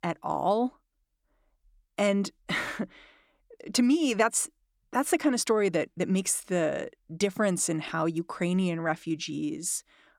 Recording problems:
none

